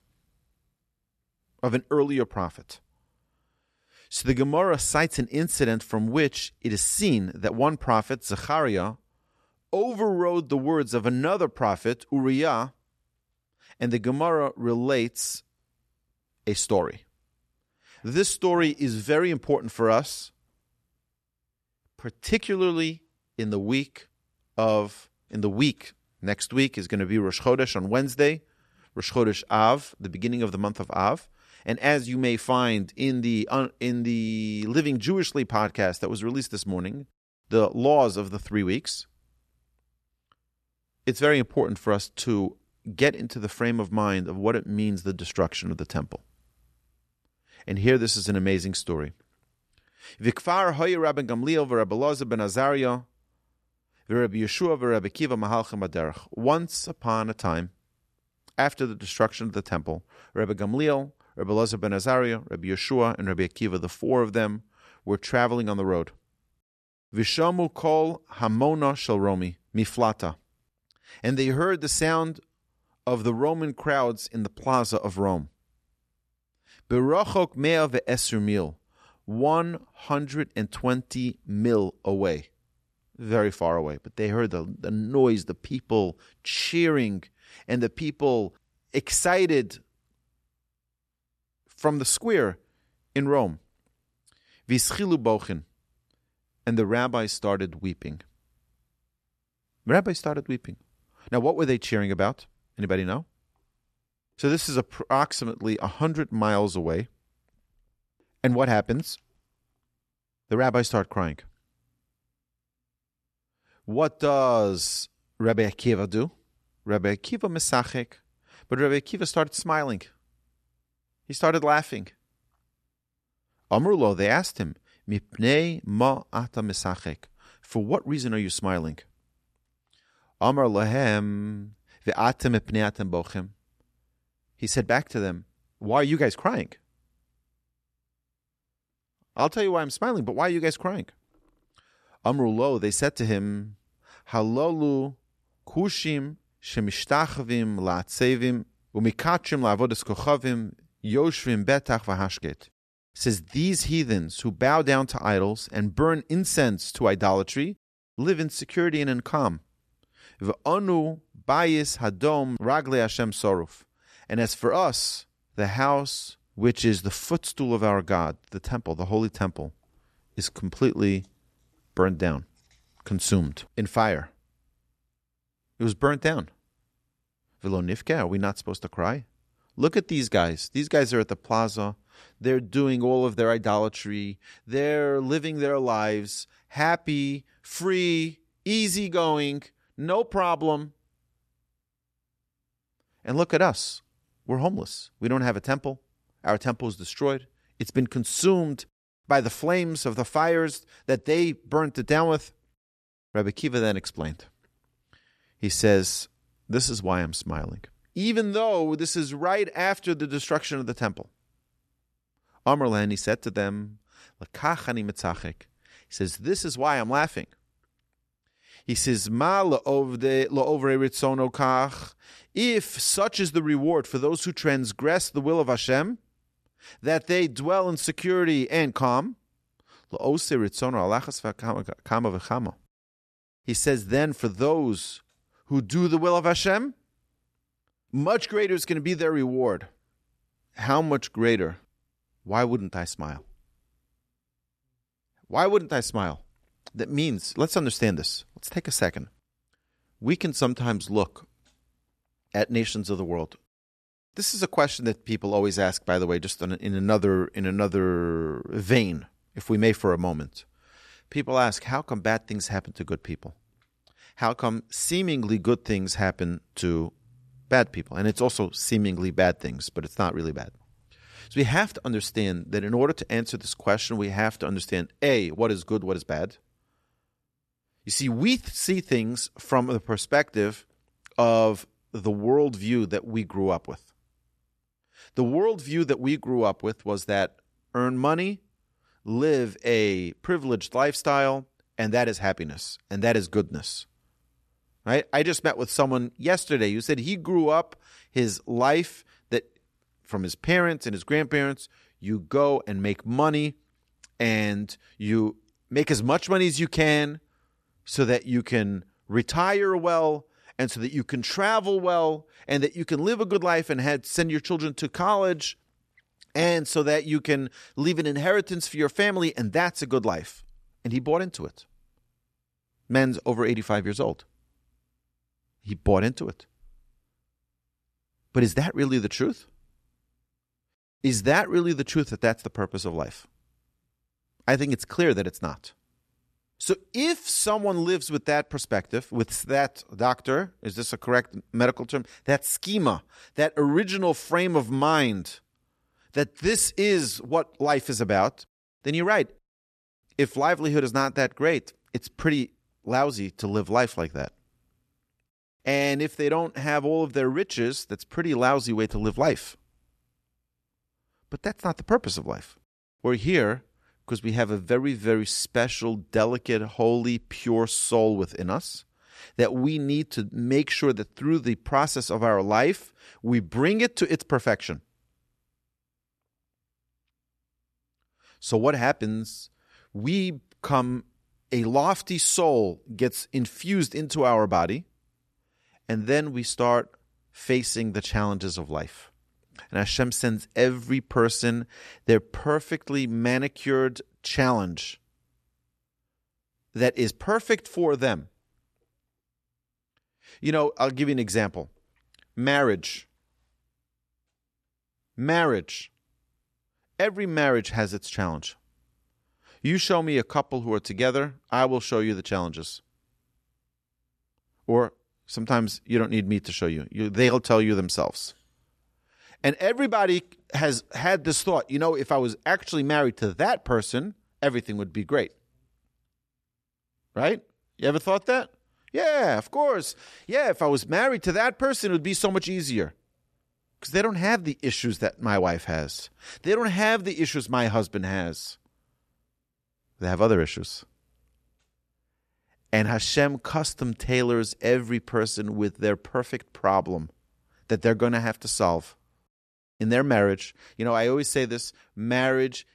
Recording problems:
none

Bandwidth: 13.5 kHz